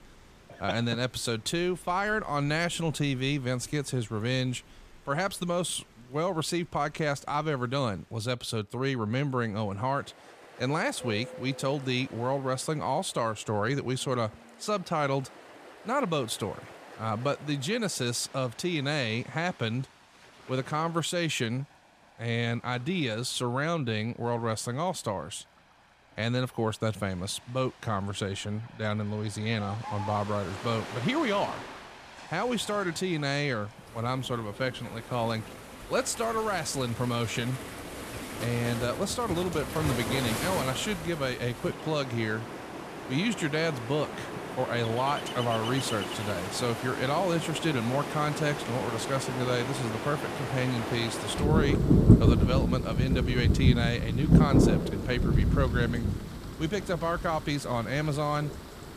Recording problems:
rain or running water; loud; throughout; 1 dB below the speech

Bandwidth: 14.5 kHz